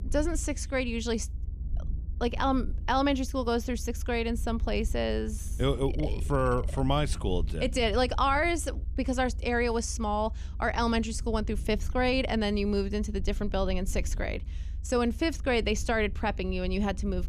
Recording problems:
low rumble; faint; throughout; 25 dB below the speech

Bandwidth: 14.5 kHz